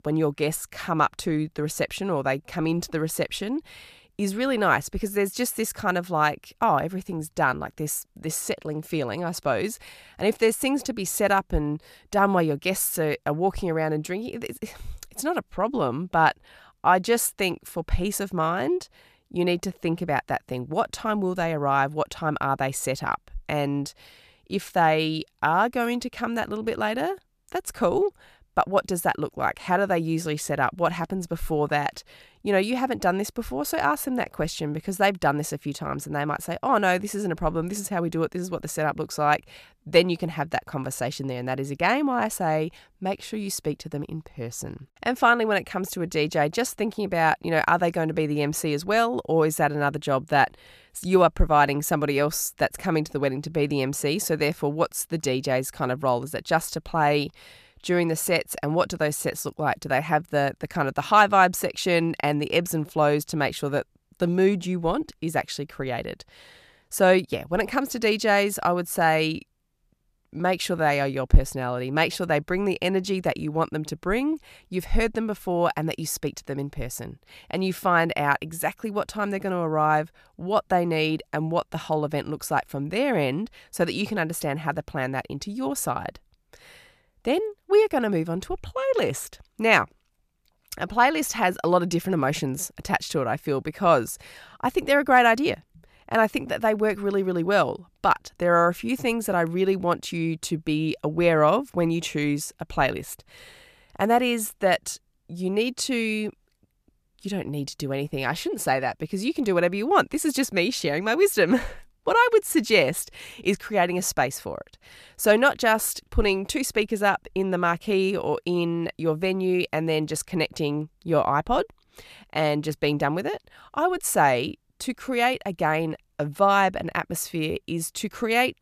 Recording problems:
none

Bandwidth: 14.5 kHz